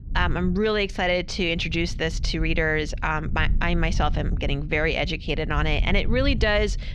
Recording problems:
muffled; very slightly; fading above 4 kHz
low rumble; faint; throughout; 20 dB below the speech

